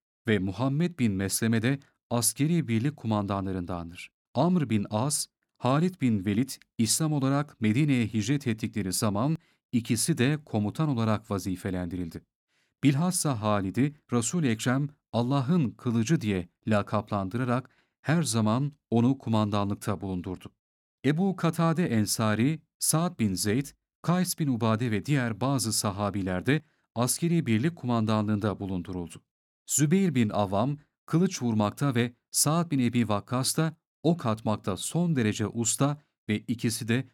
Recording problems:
none

